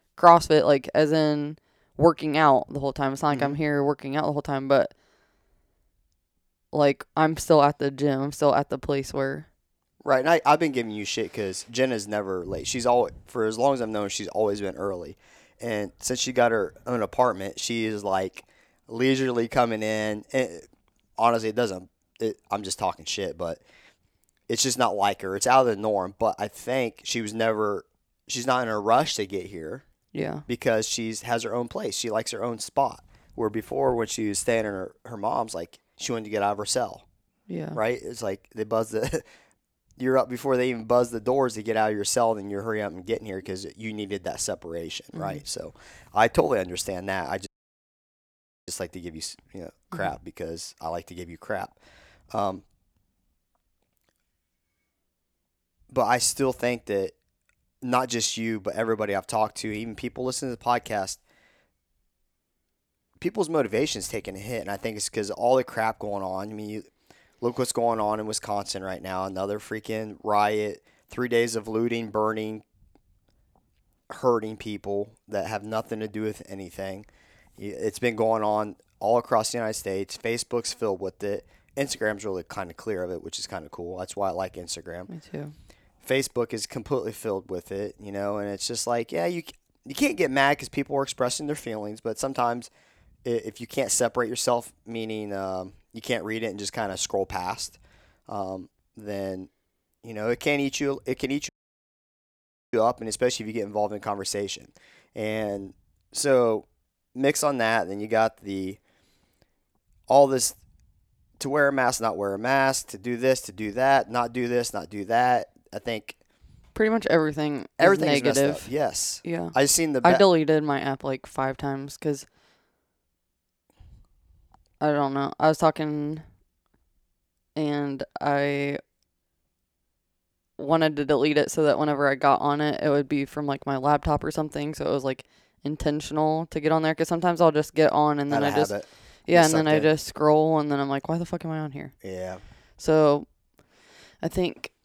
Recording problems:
audio cutting out; at 47 s for 1 s and at 1:41 for 1 s

